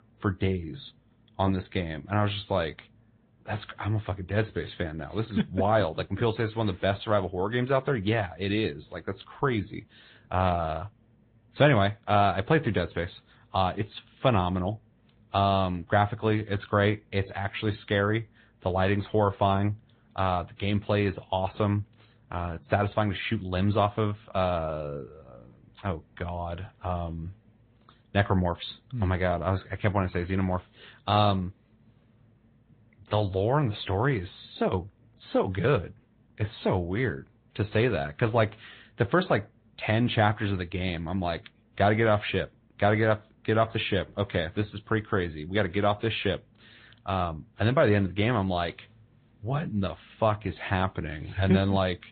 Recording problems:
high frequencies cut off; severe; nothing above 4 kHz
garbled, watery; slightly

